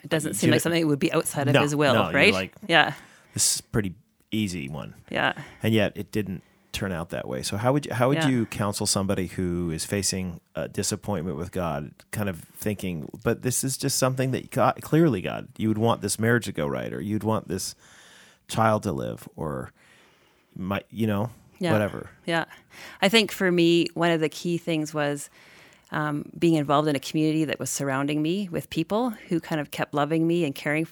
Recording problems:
none

